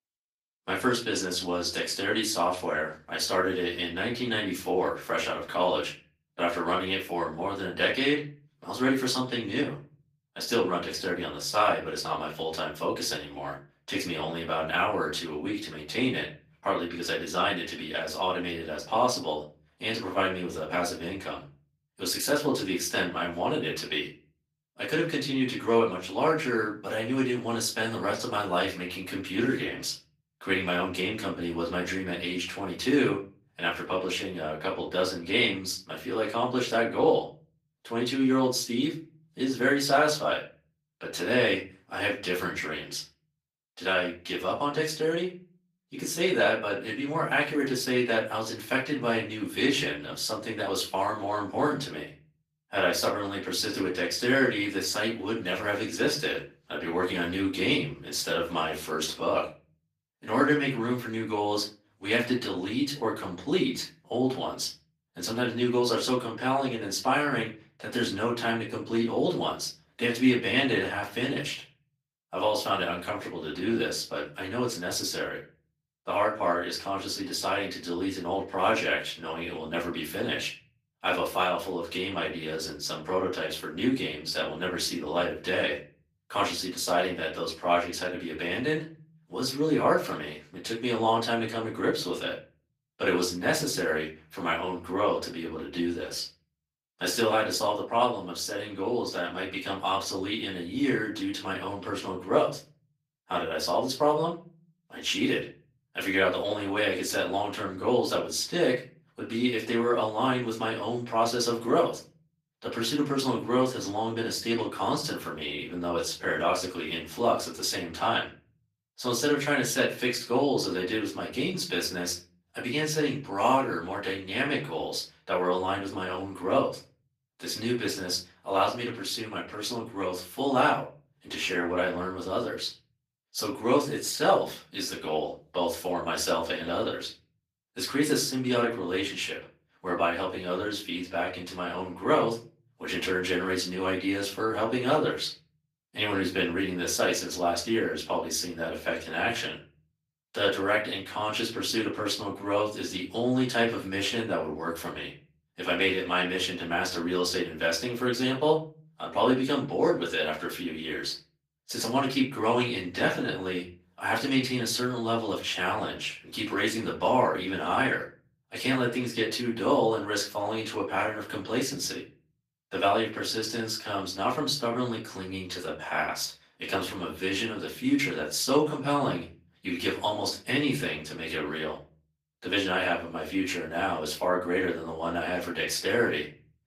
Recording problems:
off-mic speech; far
thin; somewhat; fading below 350 Hz
room echo; slight; dies away in 0.4 s
garbled, watery; slightly; nothing above 14.5 kHz

